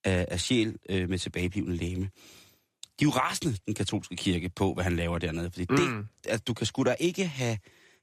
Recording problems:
none

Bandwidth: 14.5 kHz